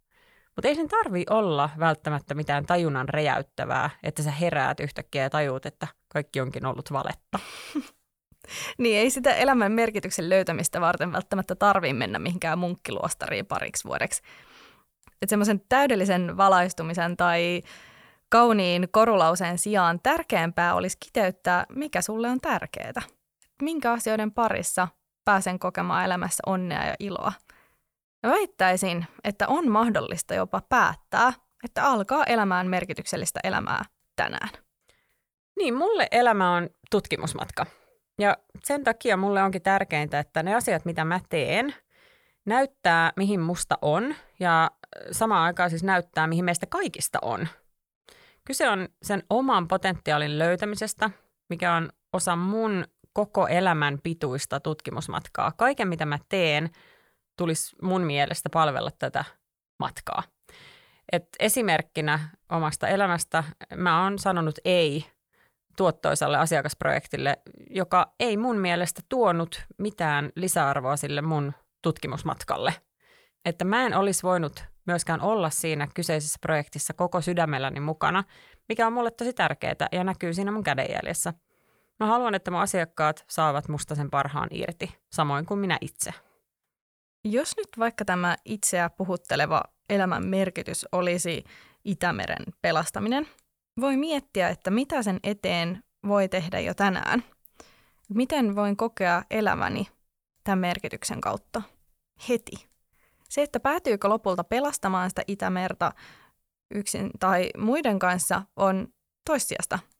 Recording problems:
none

